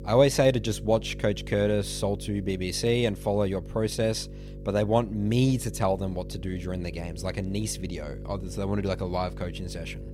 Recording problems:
electrical hum; noticeable; throughout; 50 Hz, 20 dB below the speech

